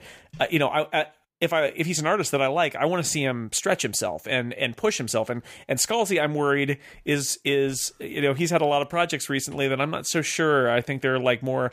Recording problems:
none

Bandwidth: 15 kHz